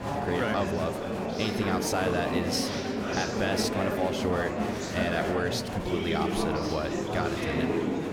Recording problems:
murmuring crowd; very loud; throughout; 1 dB above the speech

